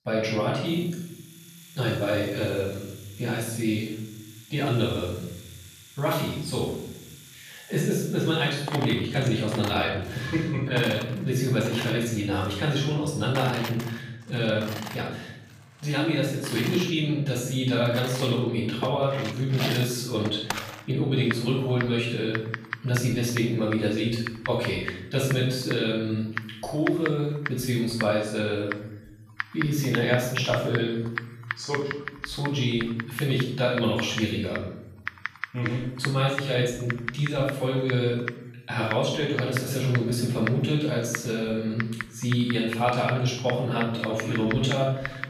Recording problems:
off-mic speech; far
room echo; noticeable; dies away in 0.7 s
household noises; noticeable; throughout; 10 dB below the speech

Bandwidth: 14.5 kHz